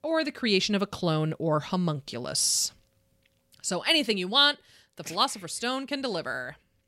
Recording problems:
none

